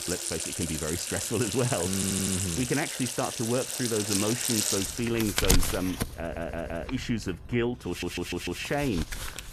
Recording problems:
household noises; very loud; throughout; 1 dB above the speech
audio stuttering; at 2 s, at 6 s and at 8 s

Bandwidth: 13.5 kHz